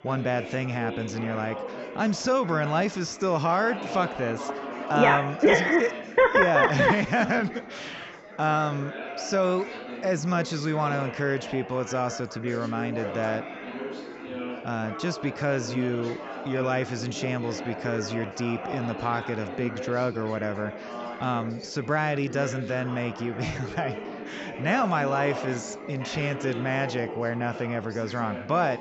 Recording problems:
high frequencies cut off; noticeable; nothing above 7.5 kHz
chatter from many people; loud; throughout; 10 dB below the speech

